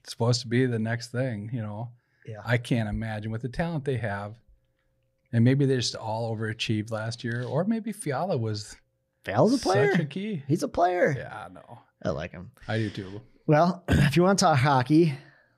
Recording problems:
none

